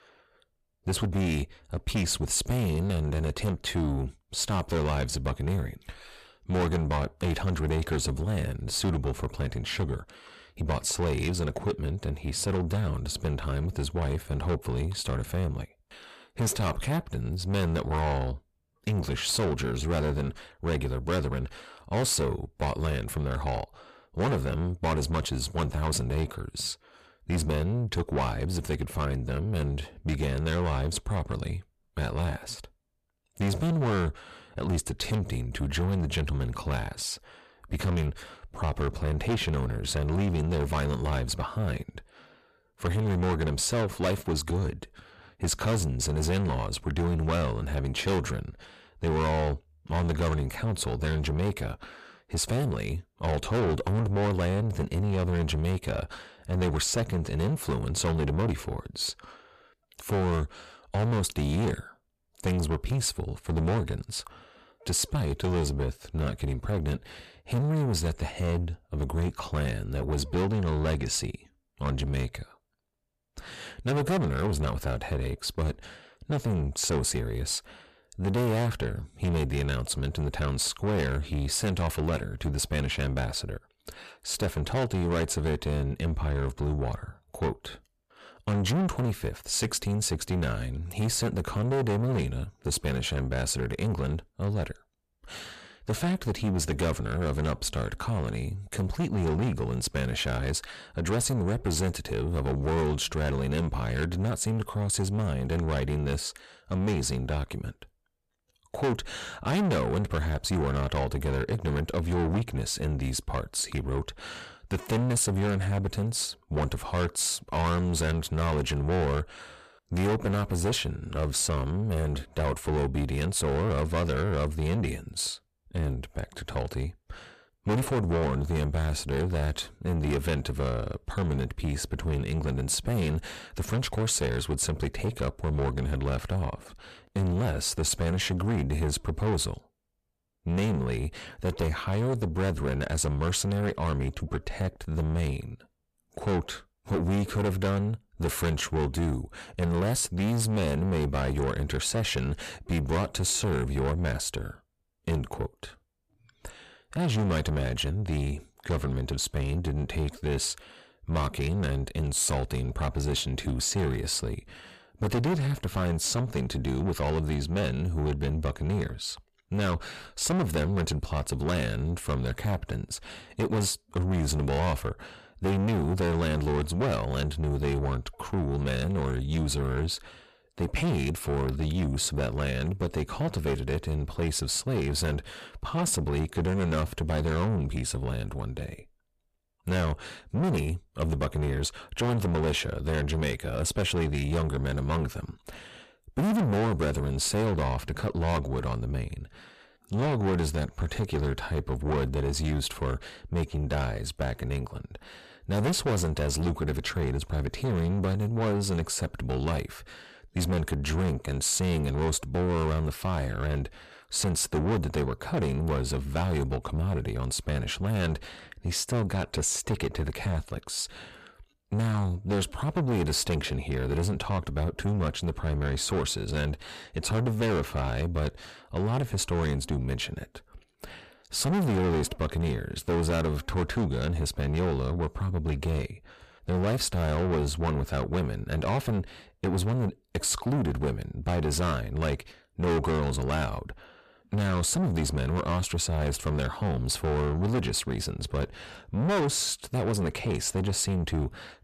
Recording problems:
distortion; heavy; 6 dB below the speech

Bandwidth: 14.5 kHz